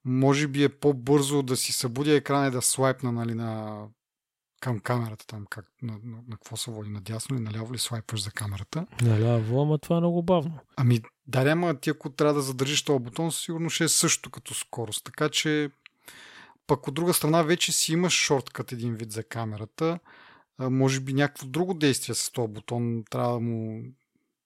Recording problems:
none

